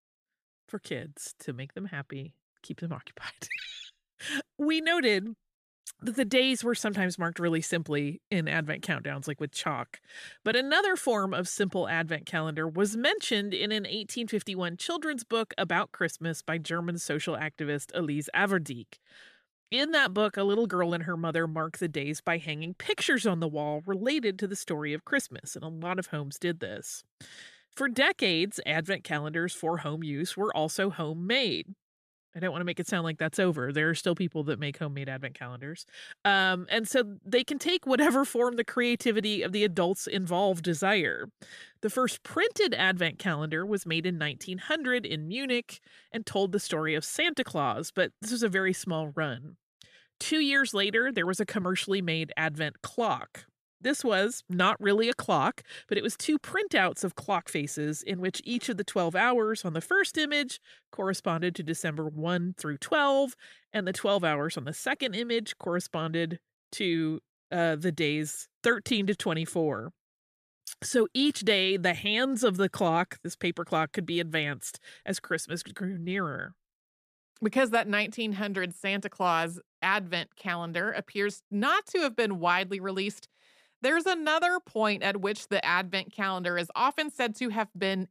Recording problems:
none

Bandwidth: 14.5 kHz